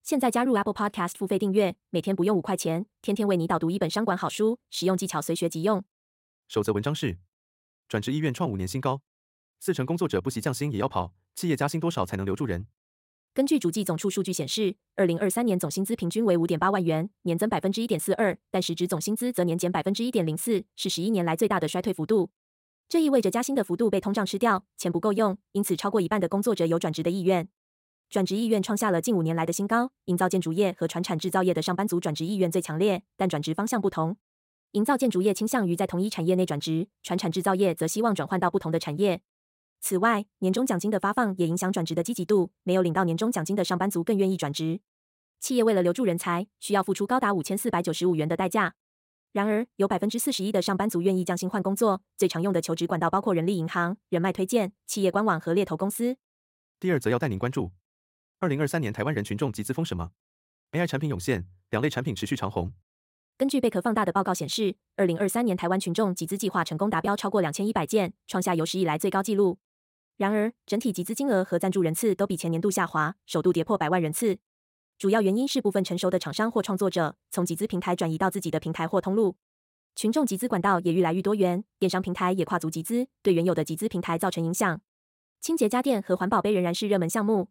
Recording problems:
wrong speed, natural pitch; too fast; 1.5 times normal speed

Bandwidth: 16 kHz